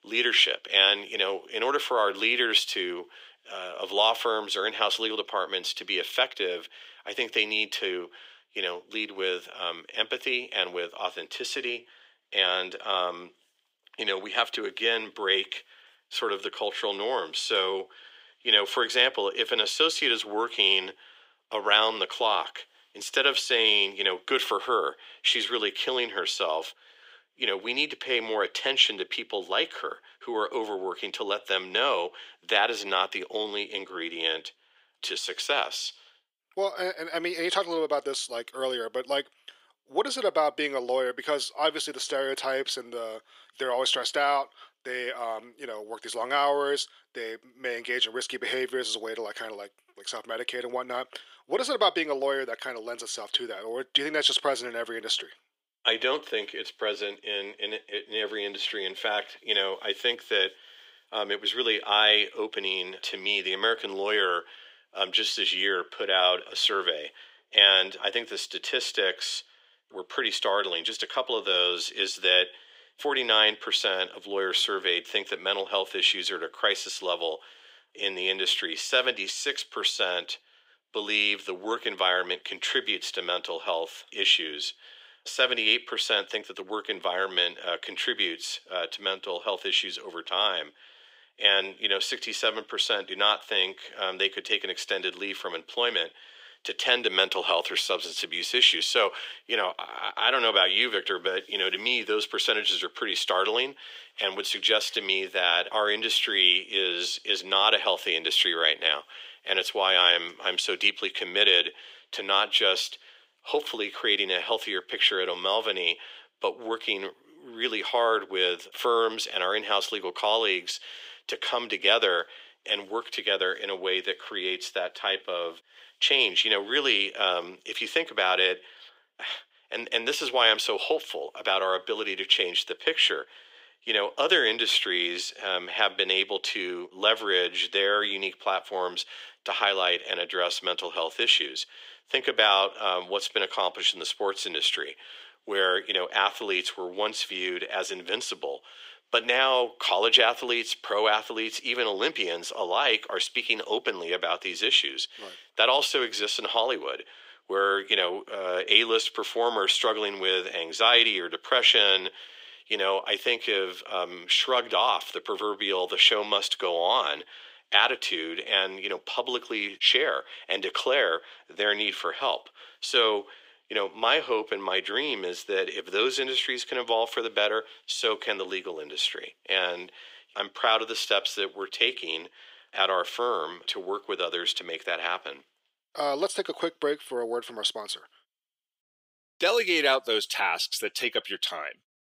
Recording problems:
thin; very; fading below 400 Hz

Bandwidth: 15.5 kHz